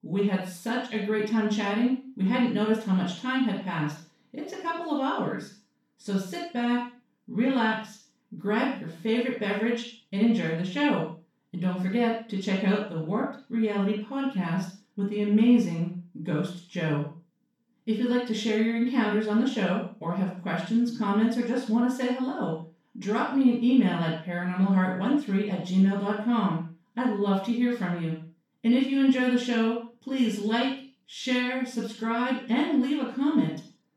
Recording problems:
off-mic speech; far
room echo; noticeable; dies away in 0.4 s

